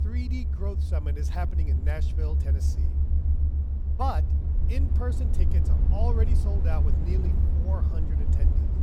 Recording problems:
low rumble; loud; throughout; 4 dB below the speech

